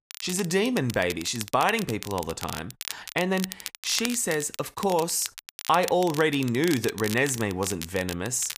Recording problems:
crackle, like an old record; noticeable; 10 dB below the speech

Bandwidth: 15 kHz